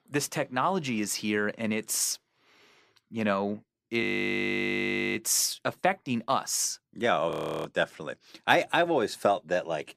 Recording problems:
audio freezing; at 4 s for 1 s and at 7.5 s

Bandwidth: 14.5 kHz